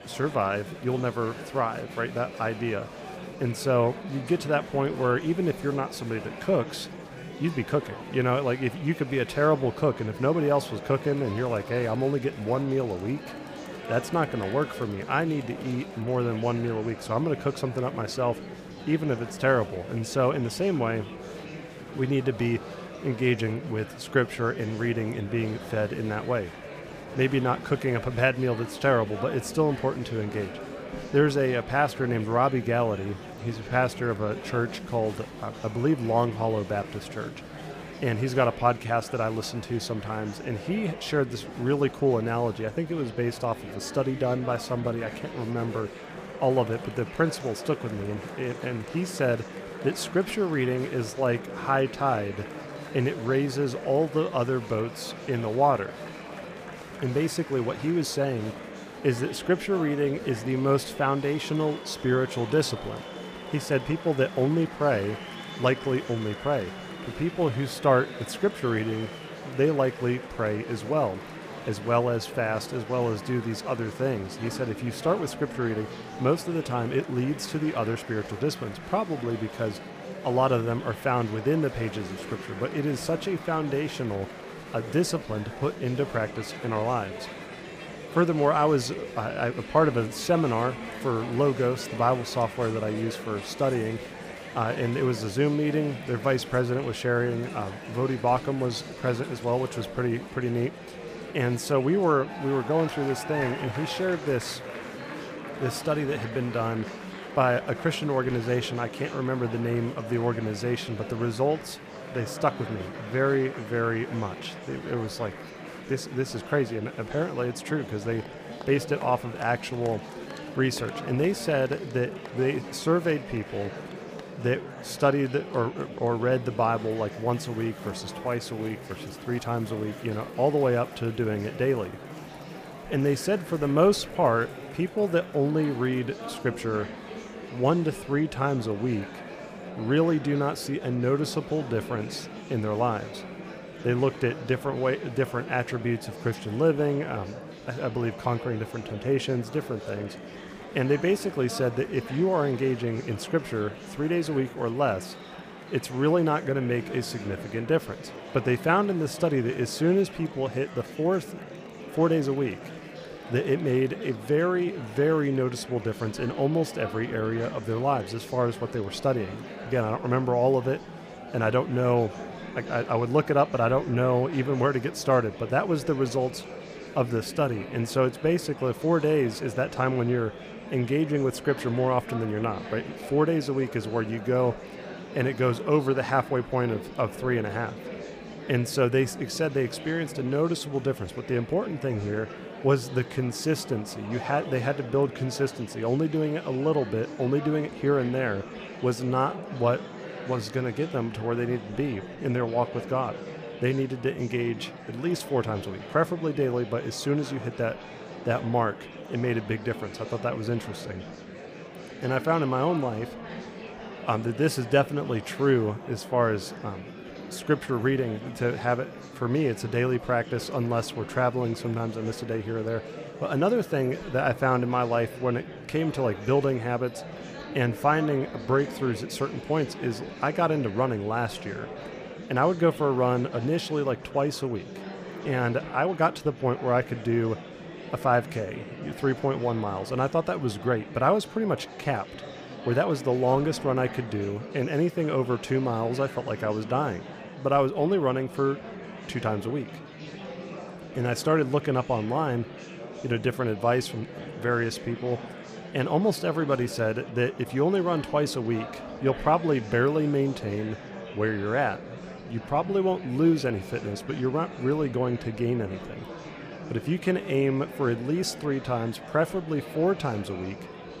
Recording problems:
murmuring crowd; noticeable; throughout; 10 dB below the speech

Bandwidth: 15 kHz